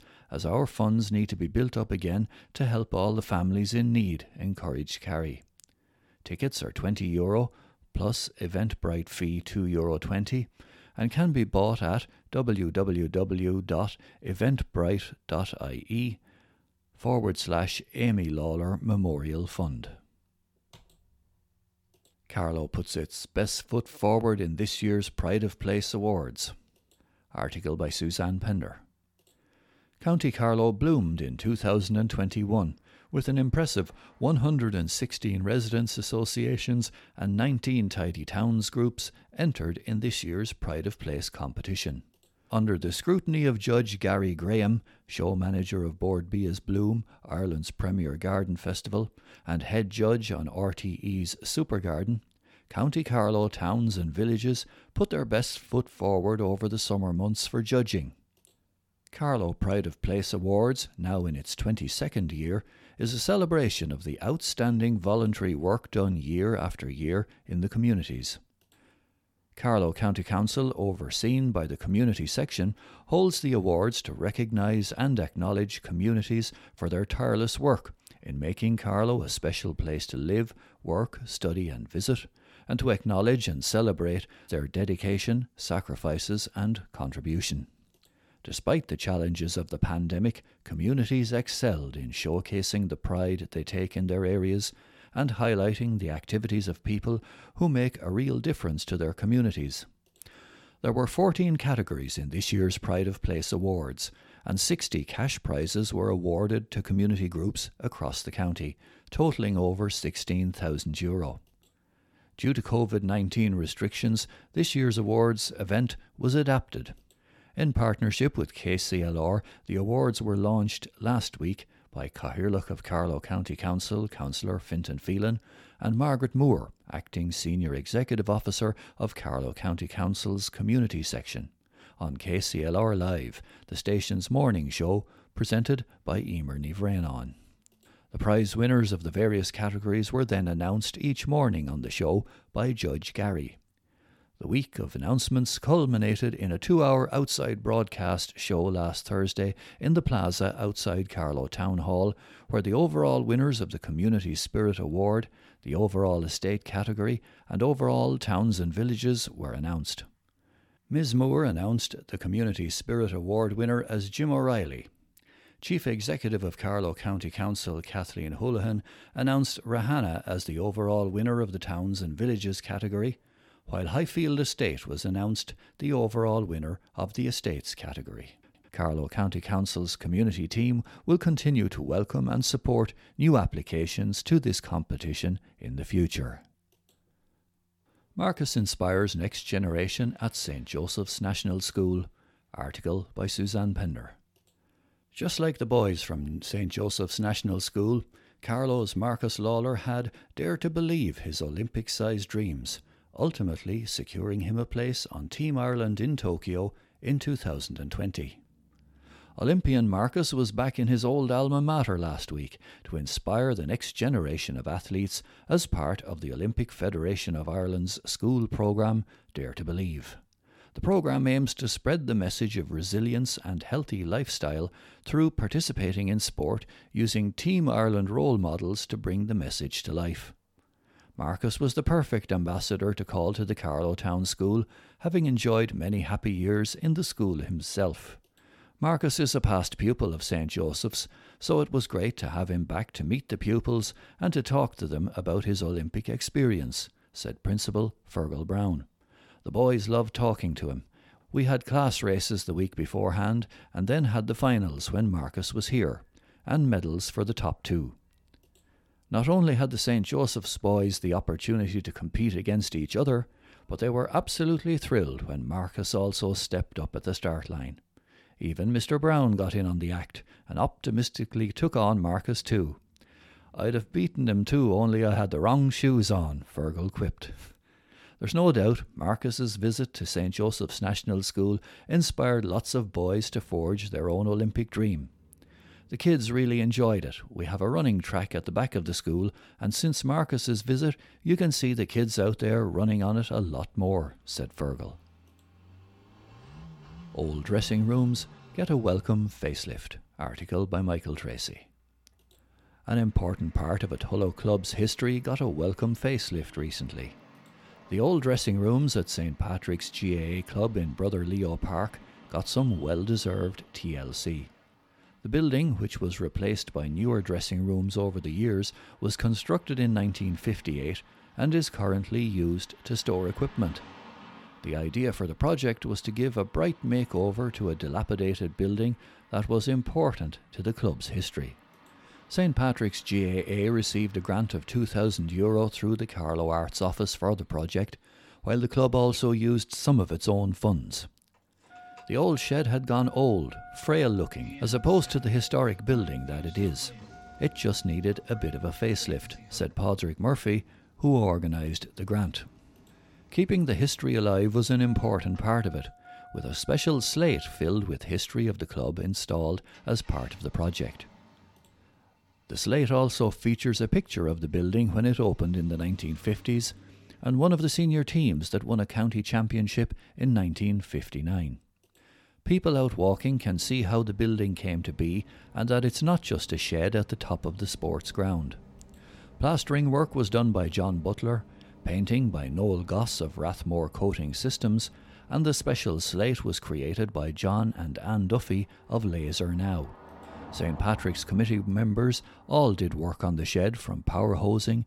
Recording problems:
traffic noise; faint; throughout; 25 dB below the speech

